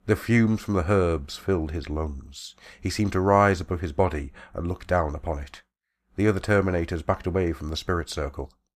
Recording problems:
none

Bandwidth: 14.5 kHz